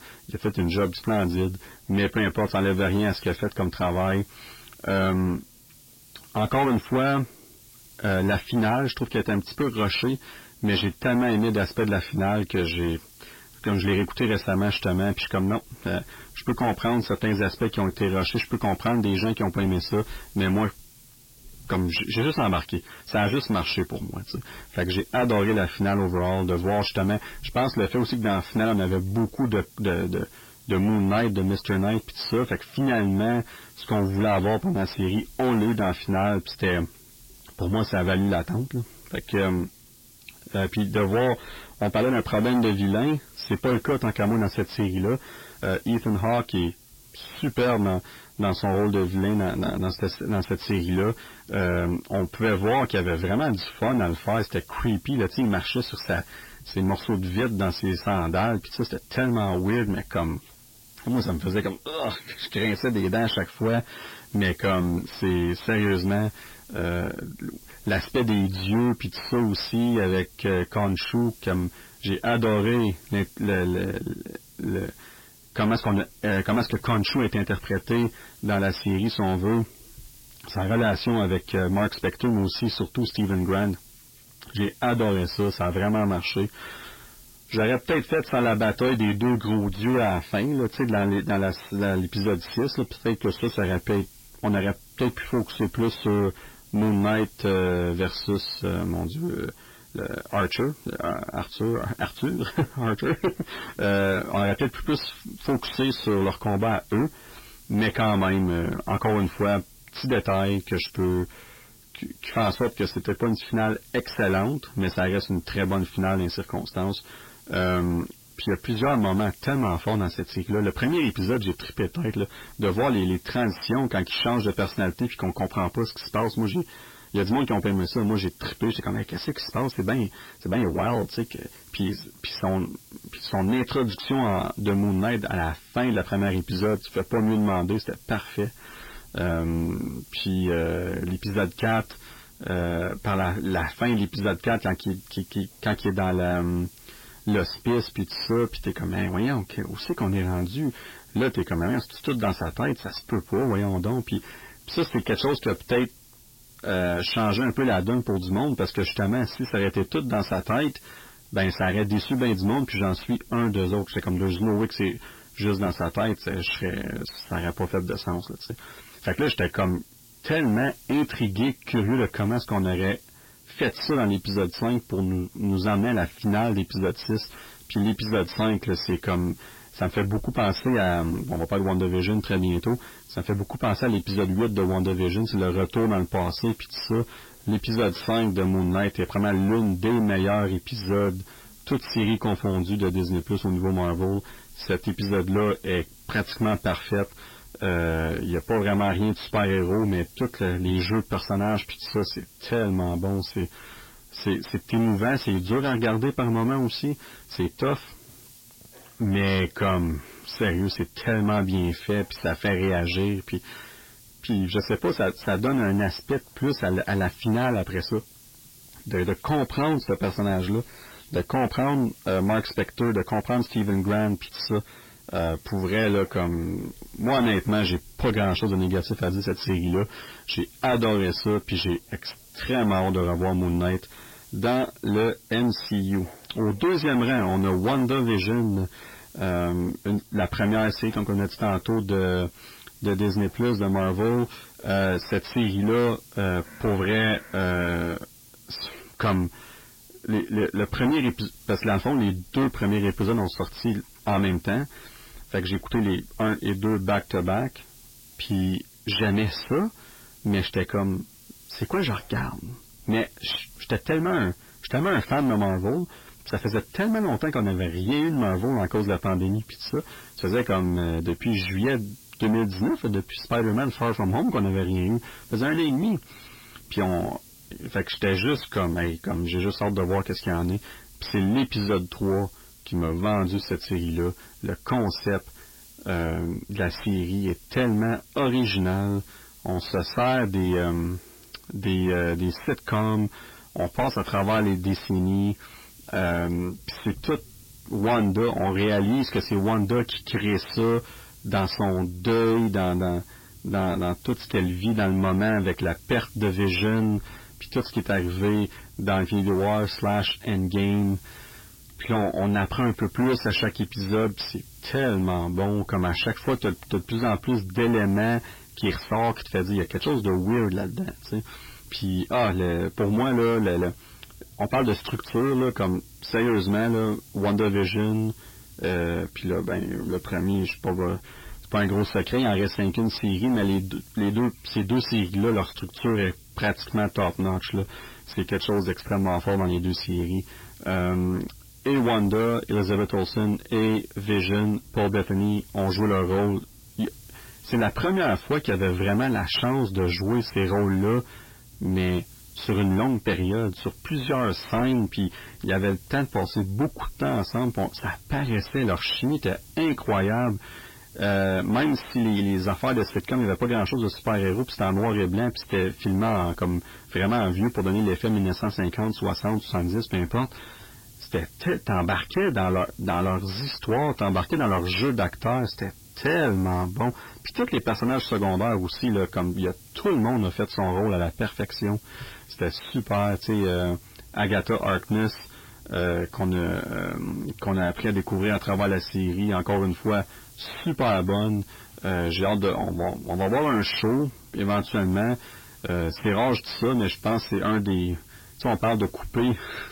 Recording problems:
distortion; heavy; 7 dB below the speech
garbled, watery; badly; nothing above 5.5 kHz
hiss; faint; throughout; 25 dB below the speech

